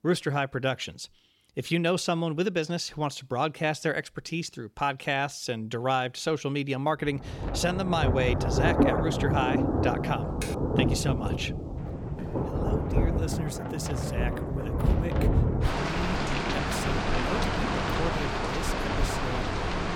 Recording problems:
rain or running water; very loud; from 7.5 s on; 2 dB above the speech
keyboard typing; noticeable; at 10 s; peak 9 dB below the speech
footsteps; faint; at 12 s; peak 15 dB below the speech

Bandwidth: 17.5 kHz